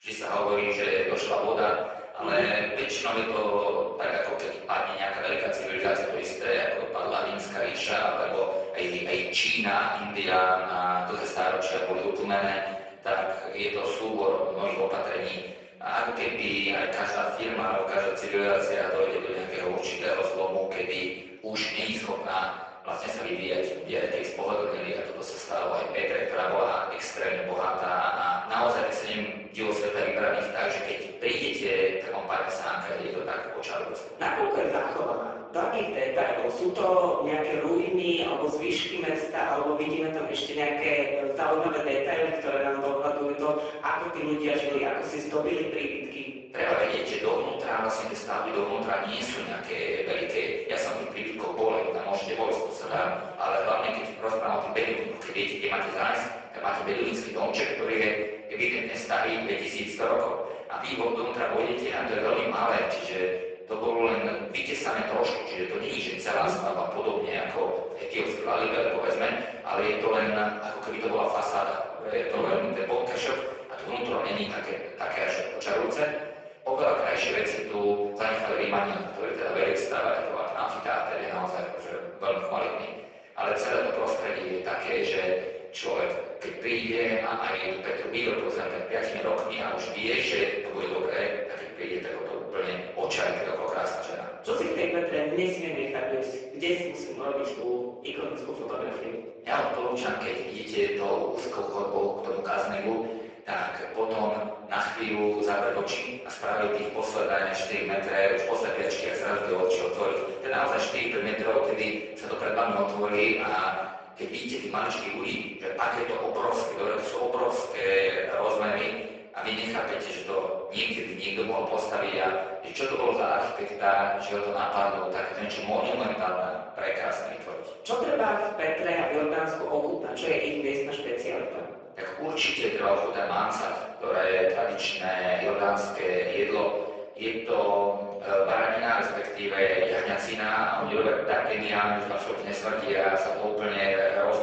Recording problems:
off-mic speech; far
garbled, watery; badly; nothing above 7.5 kHz
room echo; noticeable; dies away in 1 s
thin; somewhat; fading below 500 Hz

